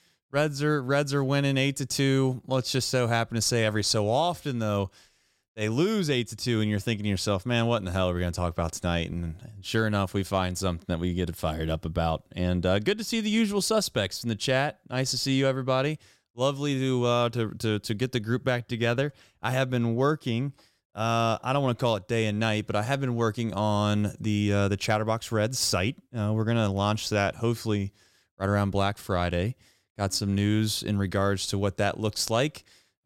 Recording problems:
none

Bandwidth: 16 kHz